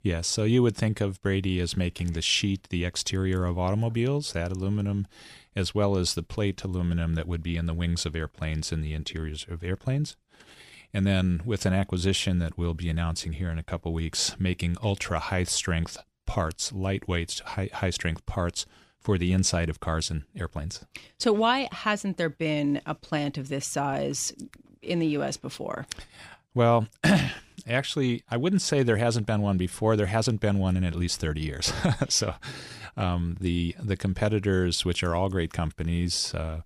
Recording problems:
none

